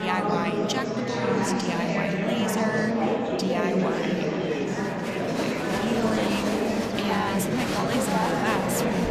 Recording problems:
murmuring crowd; very loud; throughout; 5 dB above the speech
abrupt cut into speech; at the start

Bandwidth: 14.5 kHz